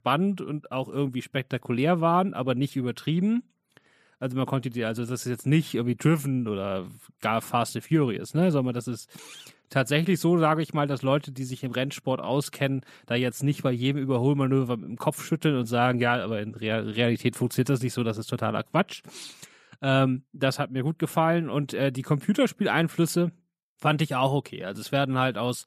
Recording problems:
none

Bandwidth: 14.5 kHz